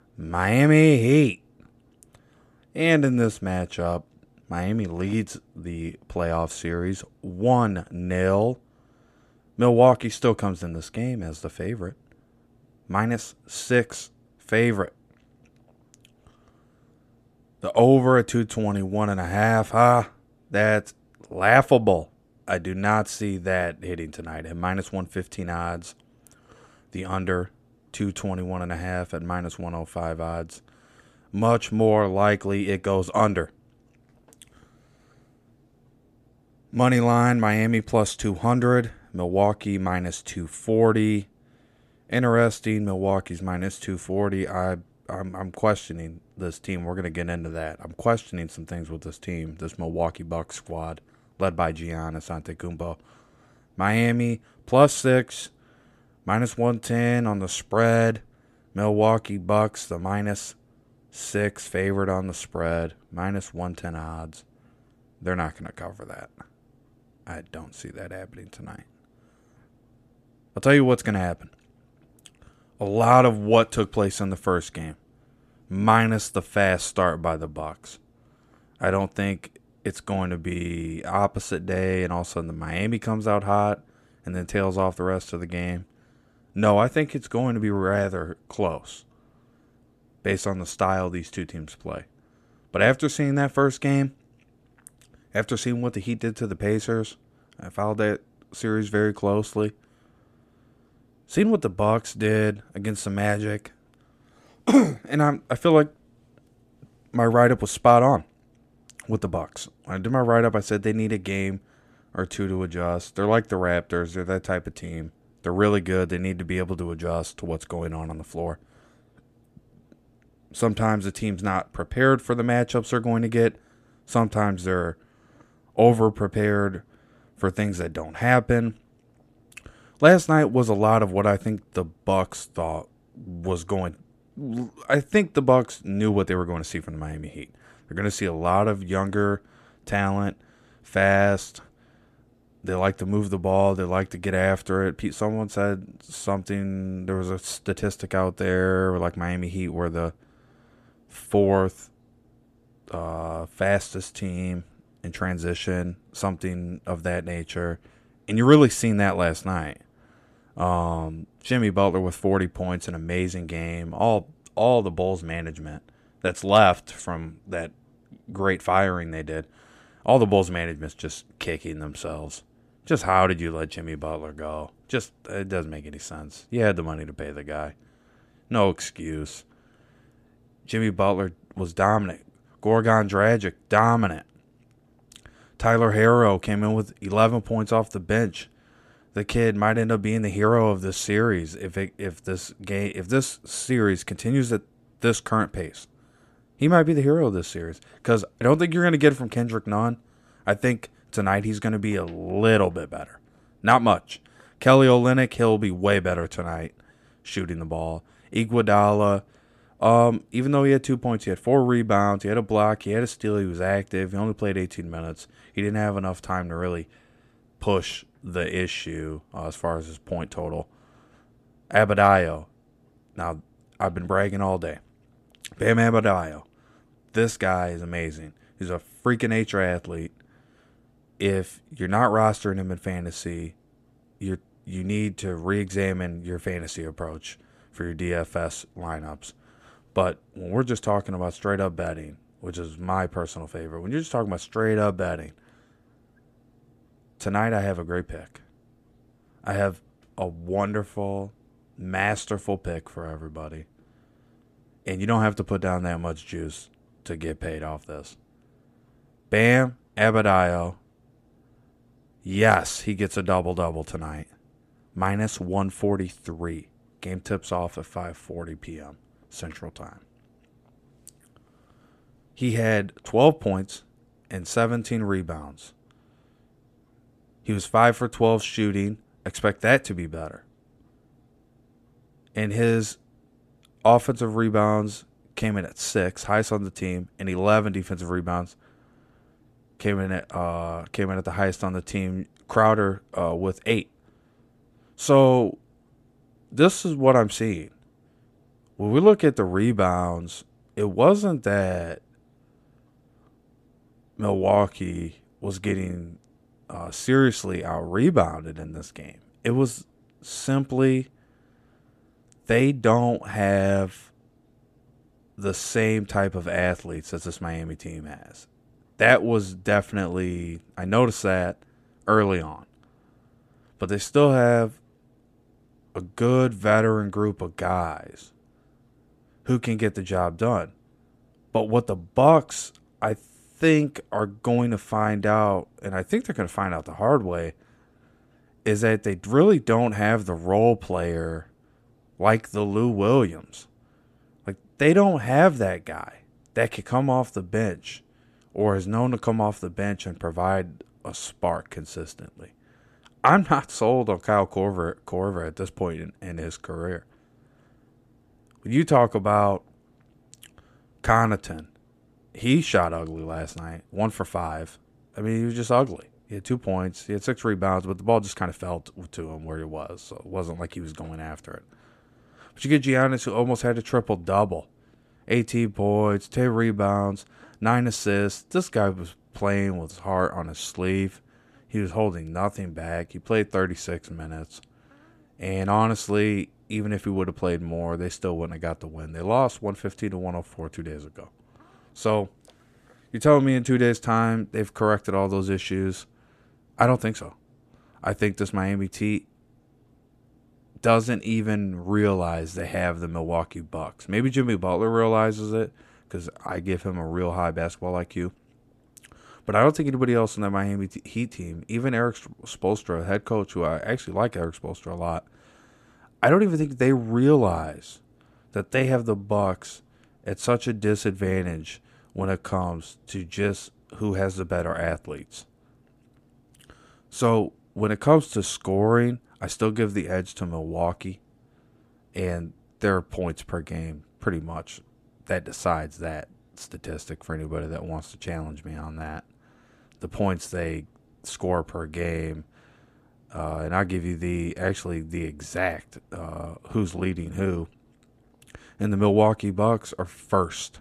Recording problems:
none

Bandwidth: 14.5 kHz